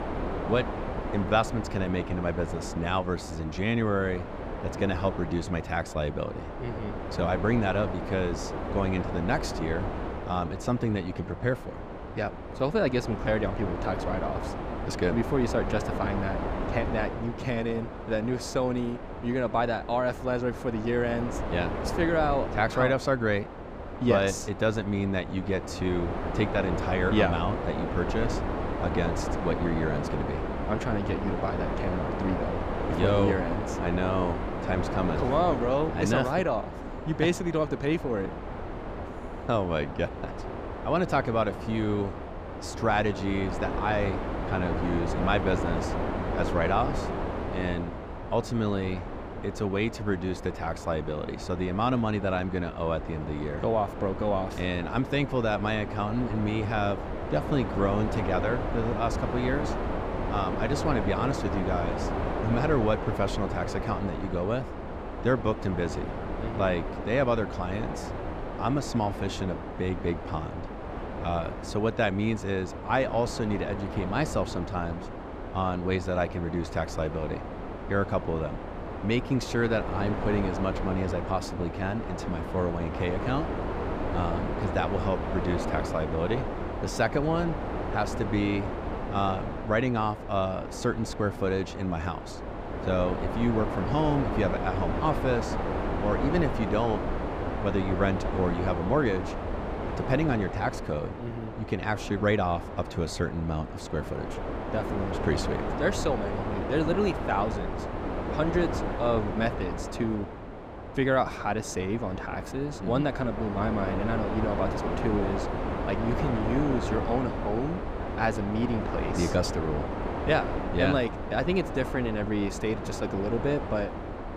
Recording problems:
wind noise on the microphone; heavy; 5 dB below the speech

